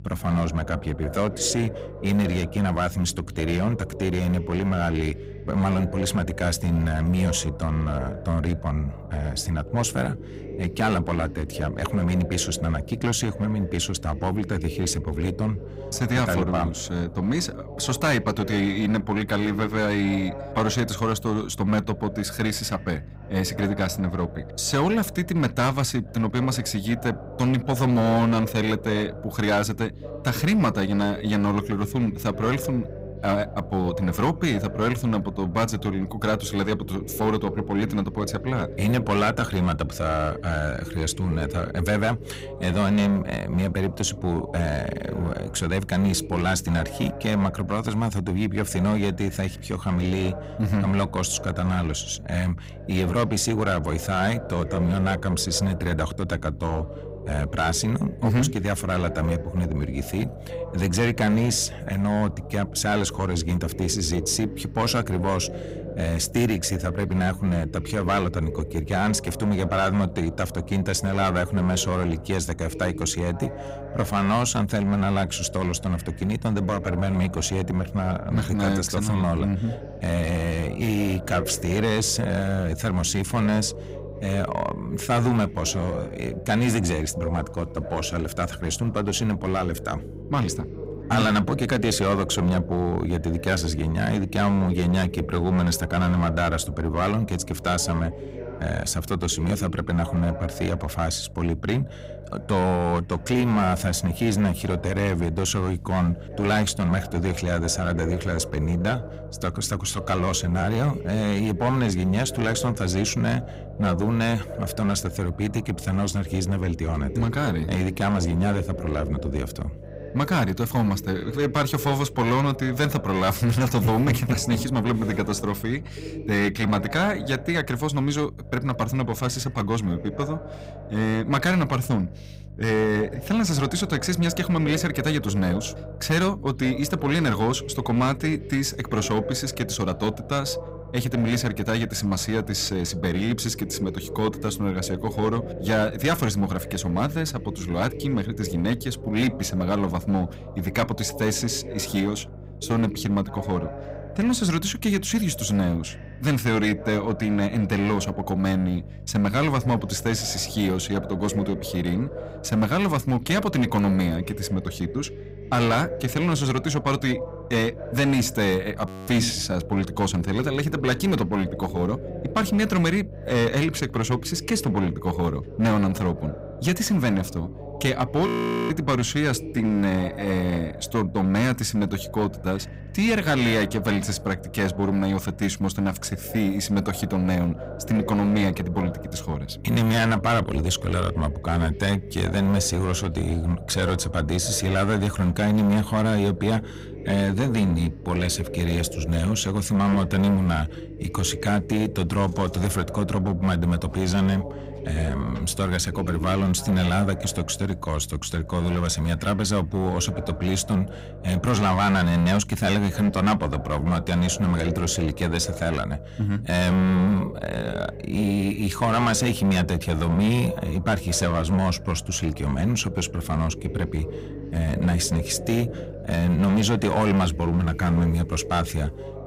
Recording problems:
distortion; slight; 7% of the sound clipped
voice in the background; noticeable; throughout; 15 dB below the speech
electrical hum; faint; throughout; 50 Hz, 25 dB below the speech
audio freezing; at 2:49 and at 2:58

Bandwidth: 15.5 kHz